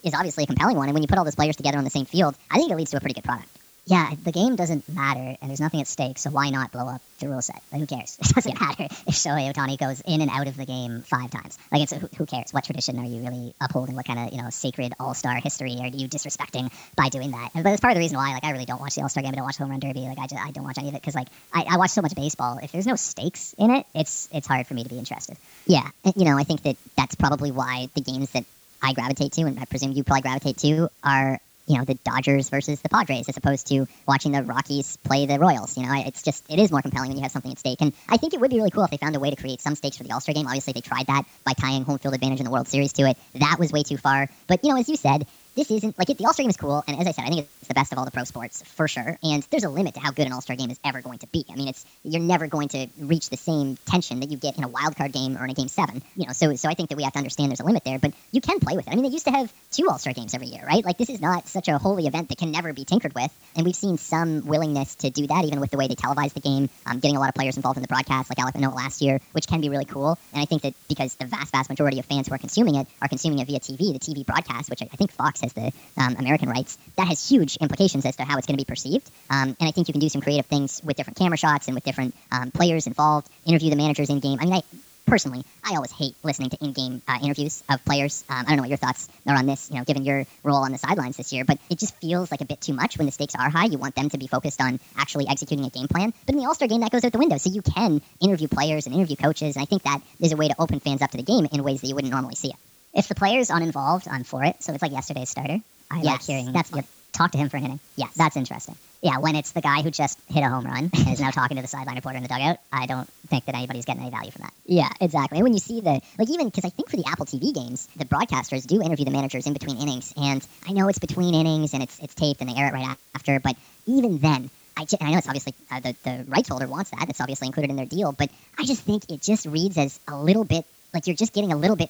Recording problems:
wrong speed and pitch; too fast and too high; 1.5 times normal speed
high frequencies cut off; noticeable; nothing above 8 kHz
hiss; faint; throughout; 25 dB below the speech

